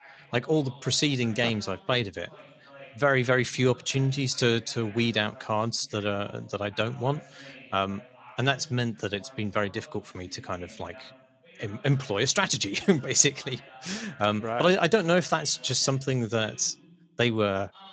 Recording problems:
garbled, watery; slightly
voice in the background; faint; throughout; 25 dB below the speech

